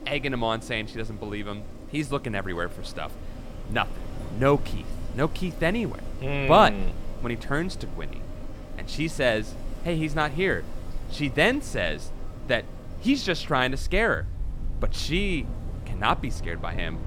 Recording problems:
wind in the background; noticeable; throughout; 10 dB below the speech

